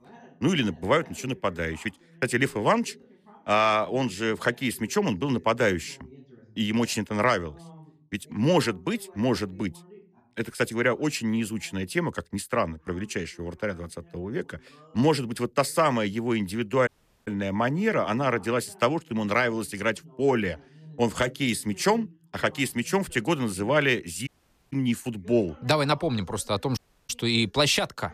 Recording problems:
voice in the background; faint; throughout; 25 dB below the speech
audio cutting out; at 17 s, at 24 s and at 27 s

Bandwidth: 14.5 kHz